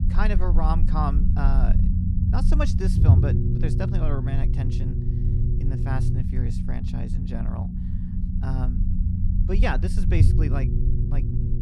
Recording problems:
low rumble; loud; throughout; 3 dB below the speech

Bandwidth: 15 kHz